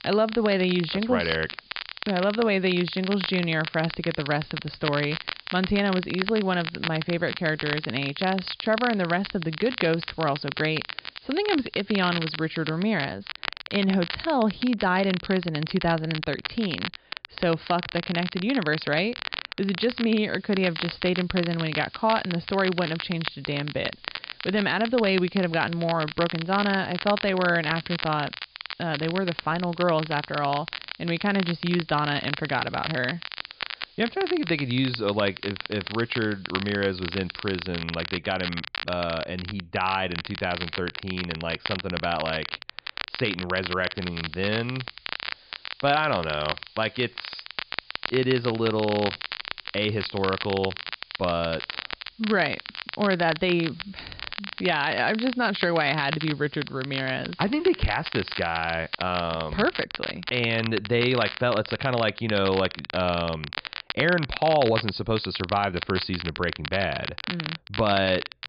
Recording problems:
high frequencies cut off; severe; nothing above 5 kHz
crackle, like an old record; loud; 7 dB below the speech
hiss; faint; until 13 s, from 20 to 38 s and from 44 s to 1:00; 25 dB below the speech

